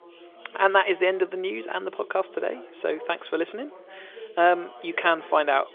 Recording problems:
phone-call audio; nothing above 3.5 kHz
background chatter; noticeable; throughout; 2 voices, 20 dB below the speech

